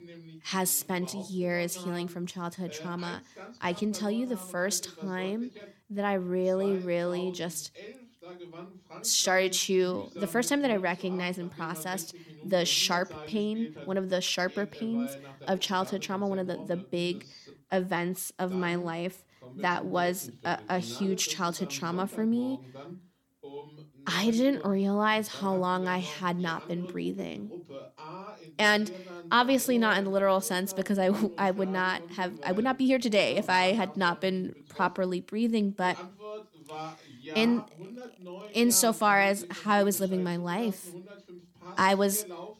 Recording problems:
voice in the background; noticeable; throughout; 15 dB below the speech

